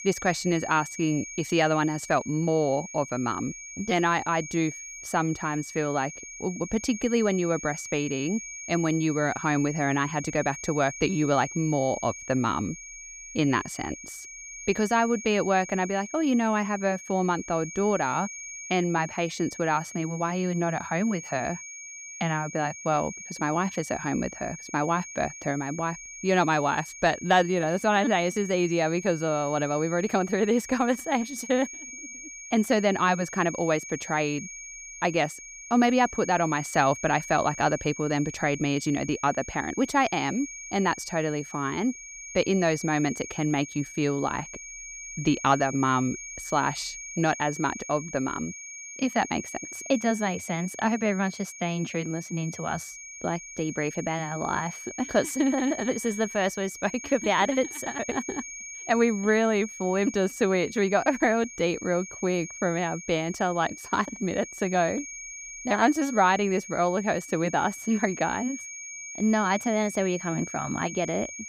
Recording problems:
high-pitched whine; noticeable; throughout; 2.5 kHz, 10 dB below the speech

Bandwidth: 15.5 kHz